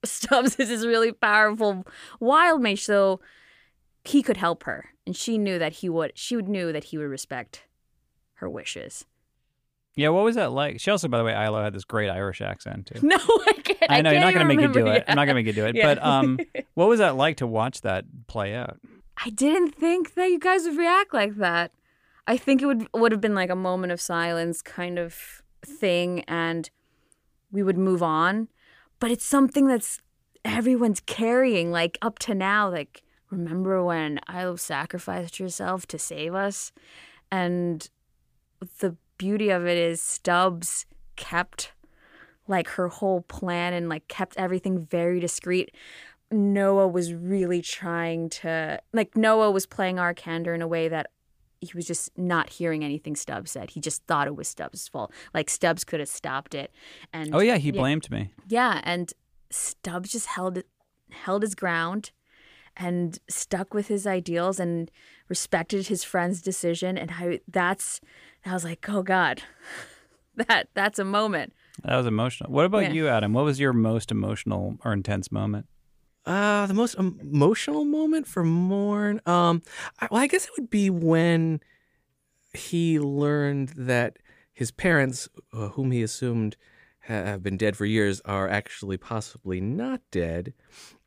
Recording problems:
none

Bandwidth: 15 kHz